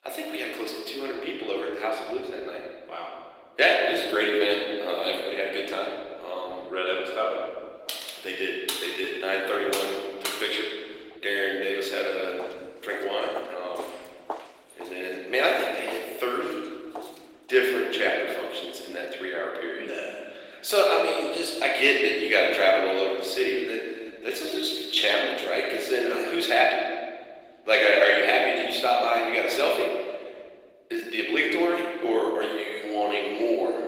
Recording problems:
off-mic speech; far
thin; very; fading below 350 Hz
room echo; noticeable; dies away in 1.6 s
garbled, watery; slightly; nothing above 16 kHz
uneven, jittery; strongly; from 4.5 to 32 s
keyboard typing; noticeable; from 8 to 11 s; peak 5 dB below the speech
footsteps; faint; from 12 to 18 s; peak 10 dB below the speech

